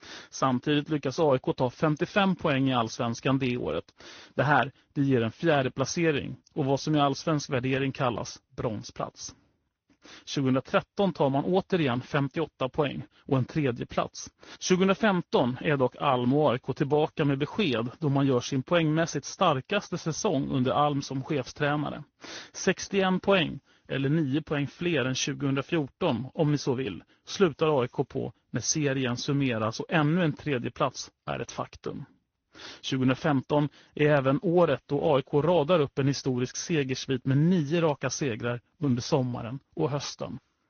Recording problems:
high frequencies cut off; noticeable; nothing above 6 kHz
garbled, watery; slightly

